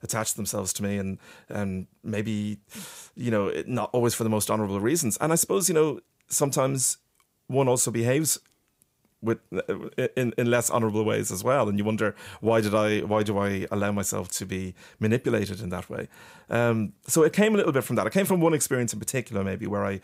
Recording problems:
none

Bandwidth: 15.5 kHz